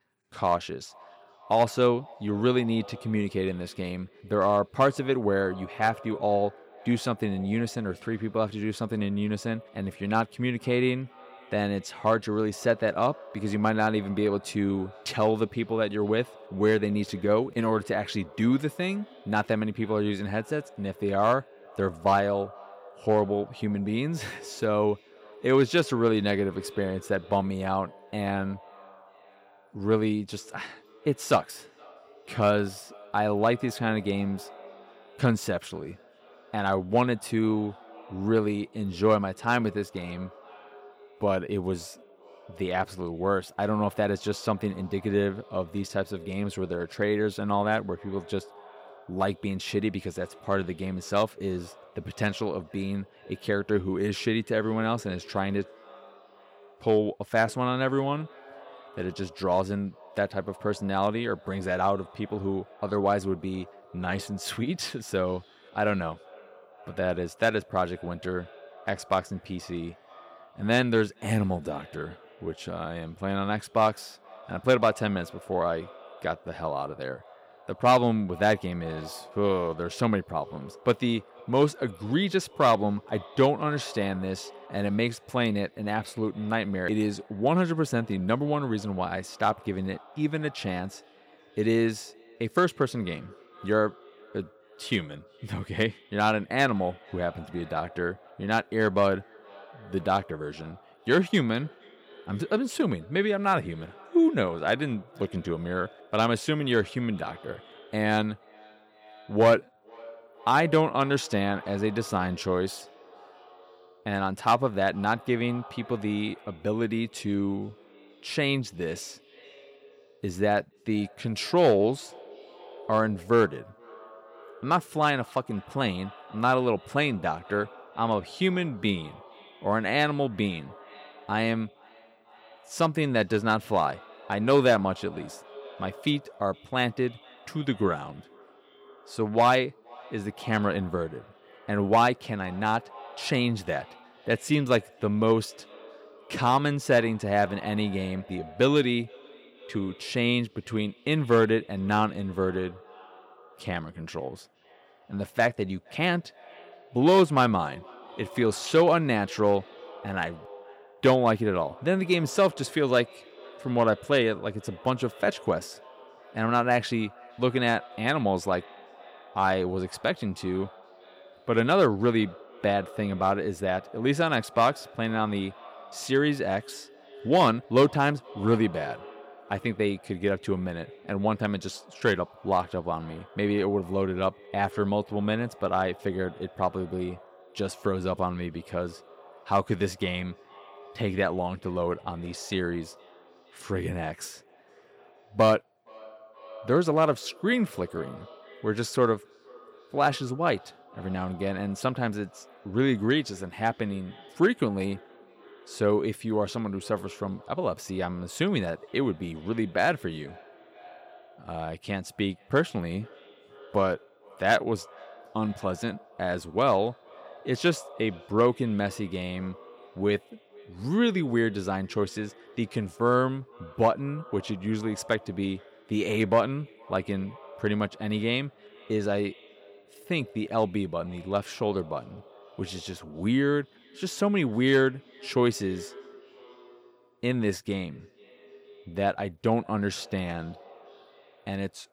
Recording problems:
echo of what is said; faint; throughout; 470 ms later, 20 dB below the speech

